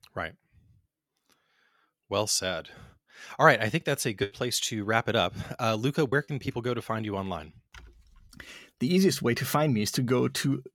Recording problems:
choppy; occasionally; from 4 to 6.5 s; 4% of the speech affected

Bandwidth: 17.5 kHz